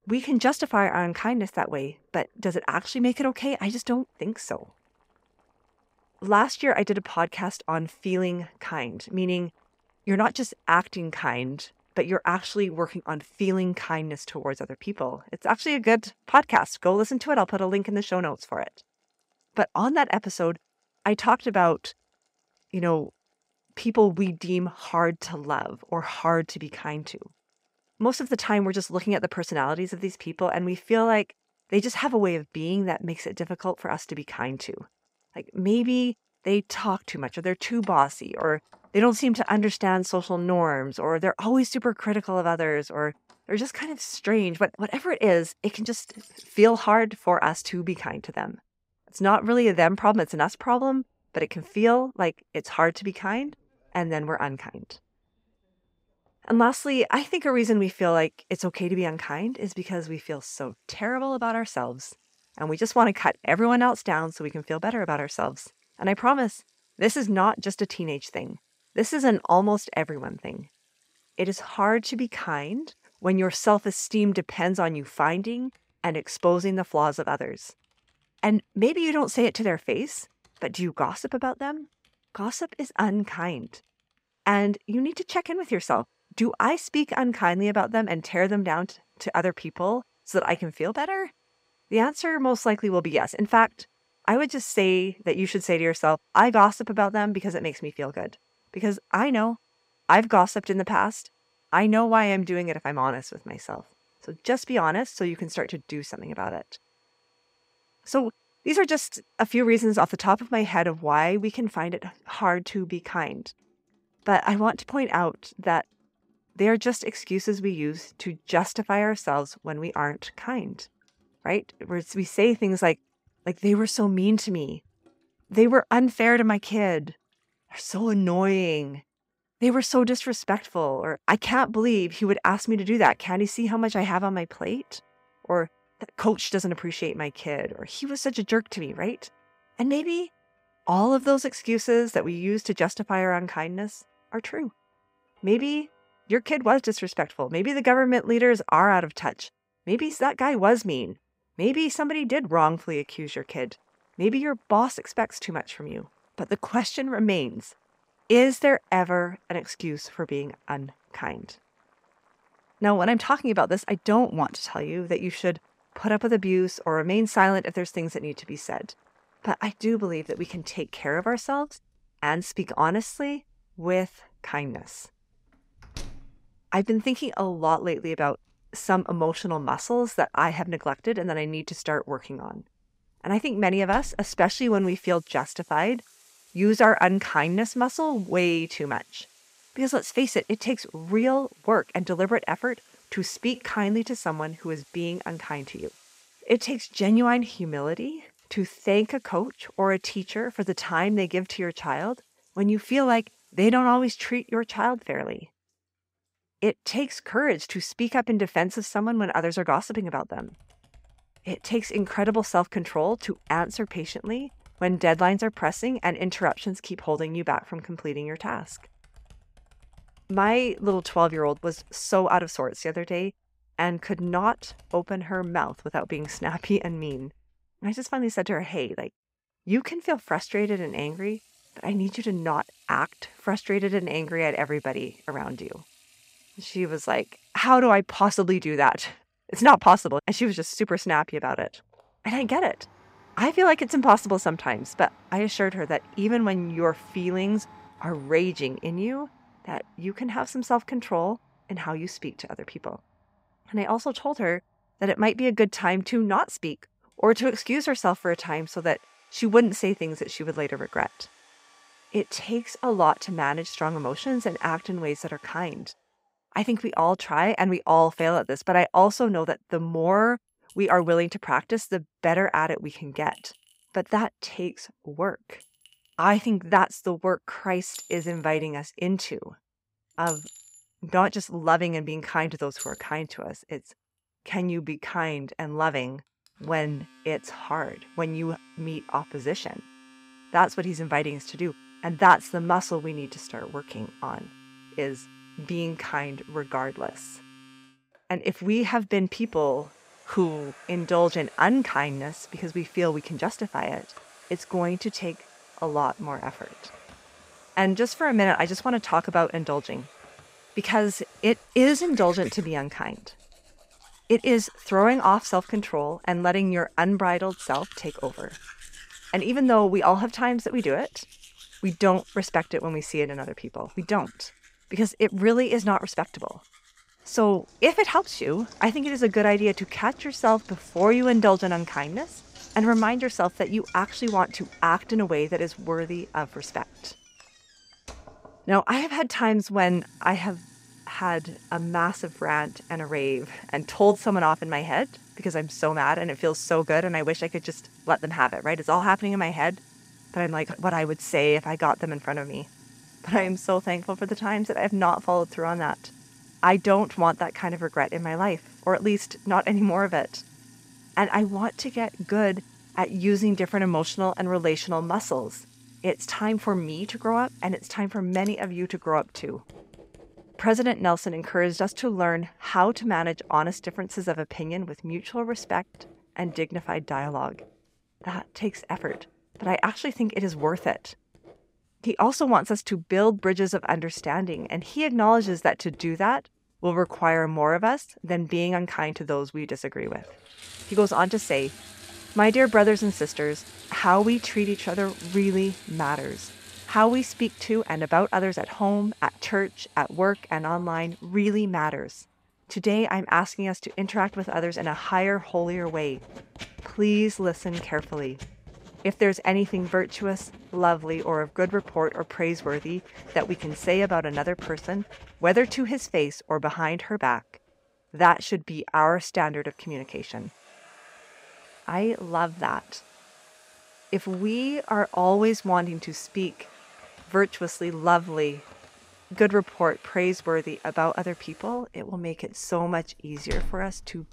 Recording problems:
household noises; faint; throughout; 25 dB below the speech

